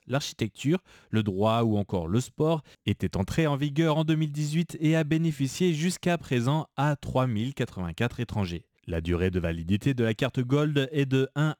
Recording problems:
none

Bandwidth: 18.5 kHz